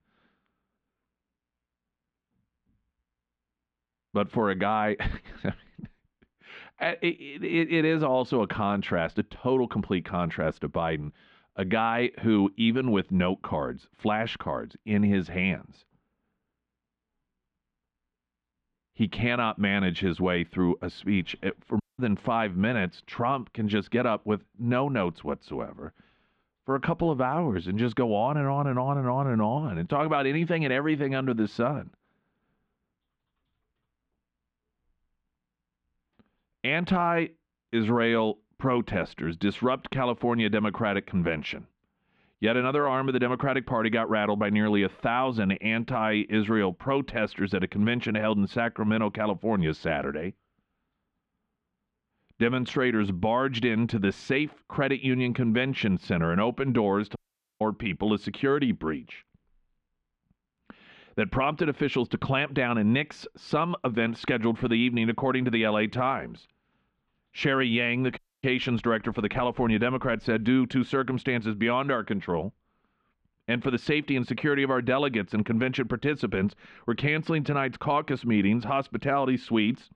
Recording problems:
muffled; very; fading above 3 kHz
audio cutting out; at 22 s, at 57 s and at 1:08

